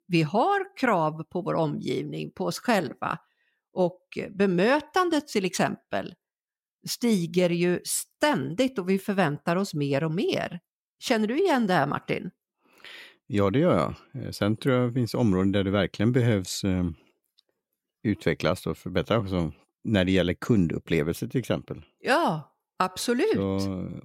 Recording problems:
none

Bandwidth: 16.5 kHz